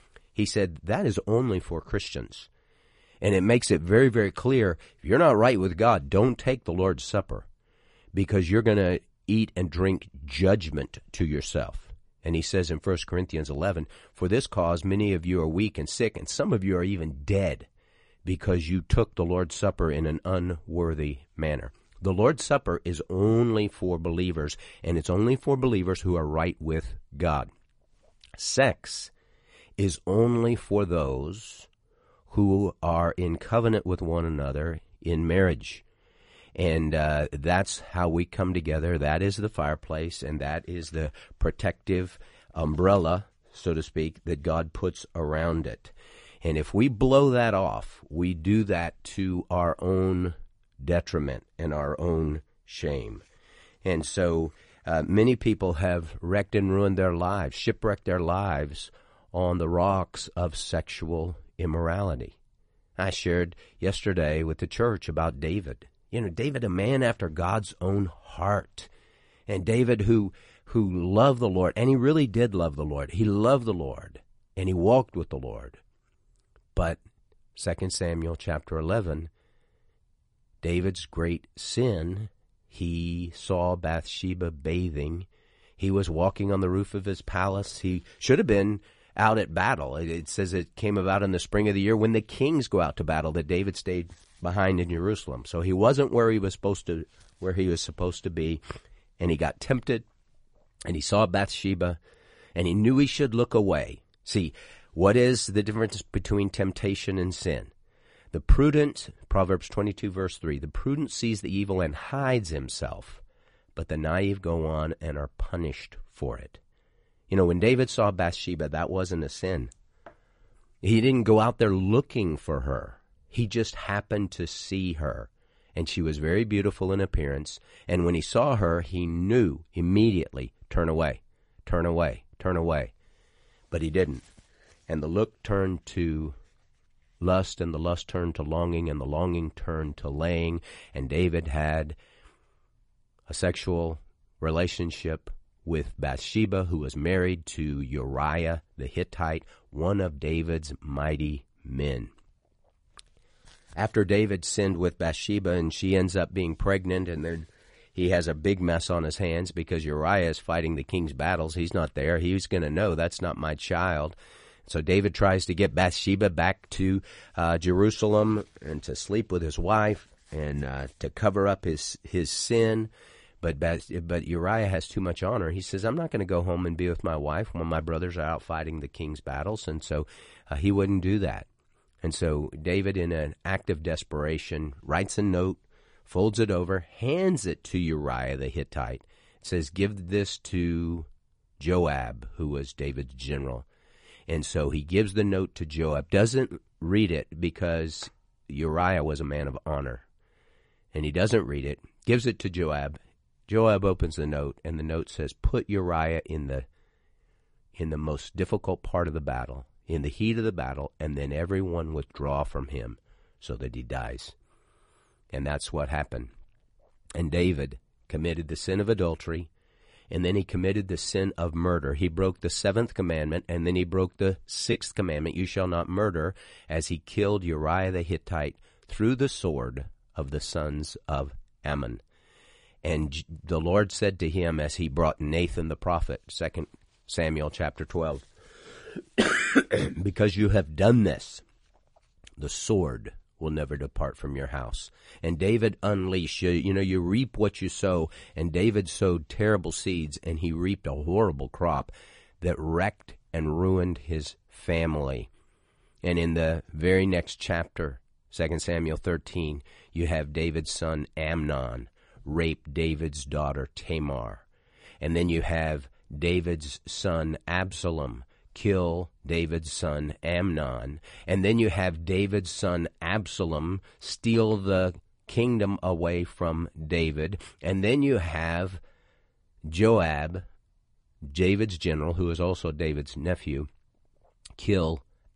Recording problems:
garbled, watery; slightly; nothing above 10 kHz

